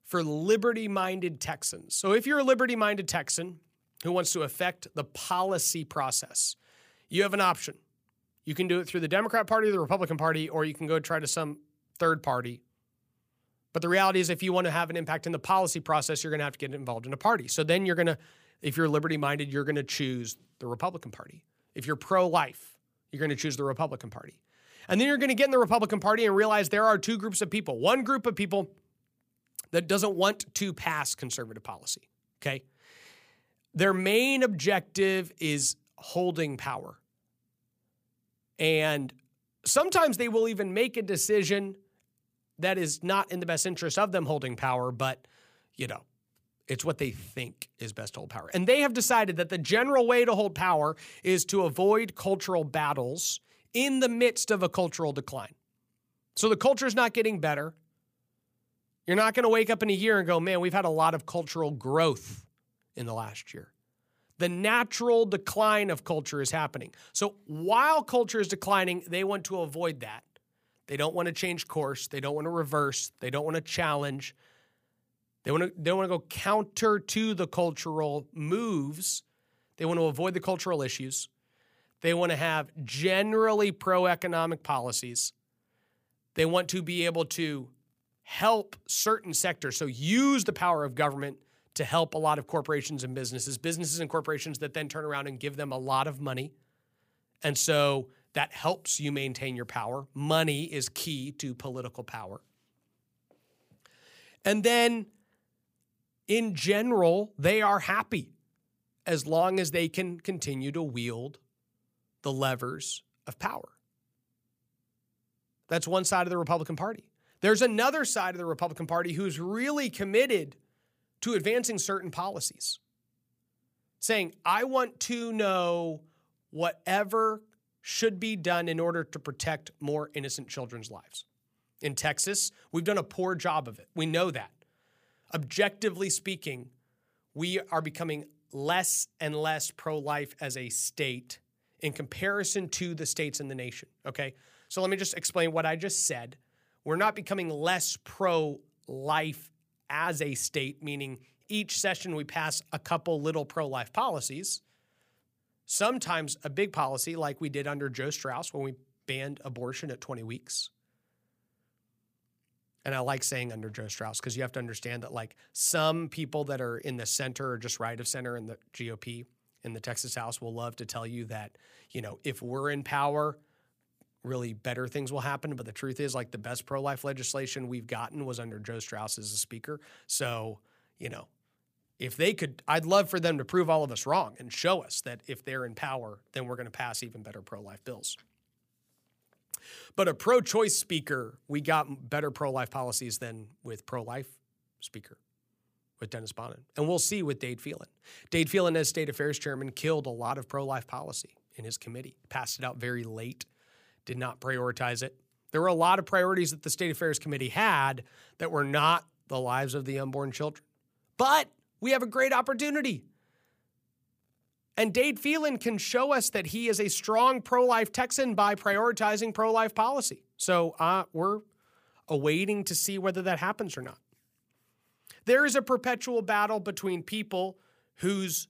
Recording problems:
none

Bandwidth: 15 kHz